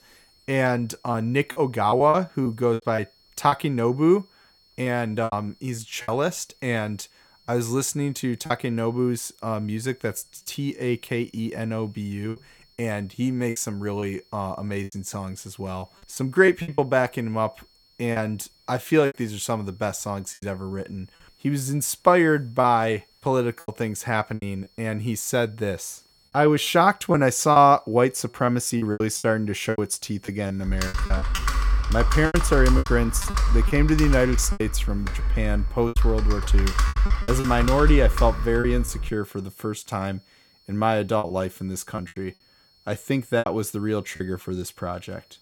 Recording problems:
high-pitched whine; faint; throughout; 4.5 kHz, 35 dB below the speech
choppy; very; 8% of the speech affected
keyboard typing; loud; from 31 to 39 s; peak 3 dB above the speech

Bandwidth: 17 kHz